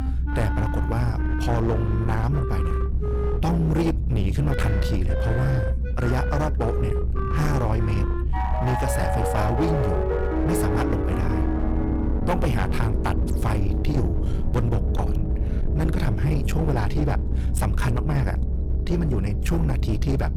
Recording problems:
distortion; slight; 24% of the sound clipped
background music; loud; throughout; 5 dB below the speech
low rumble; loud; throughout; 8 dB below the speech

